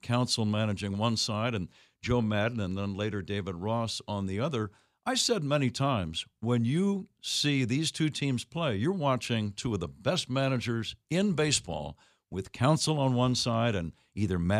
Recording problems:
abrupt cut into speech; at the end

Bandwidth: 15 kHz